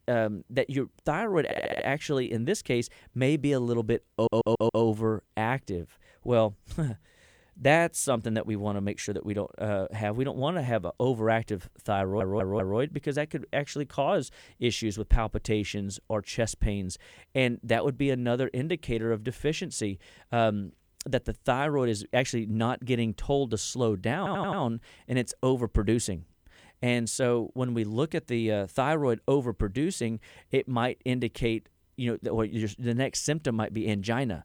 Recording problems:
audio stuttering; 4 times, first at 1.5 s

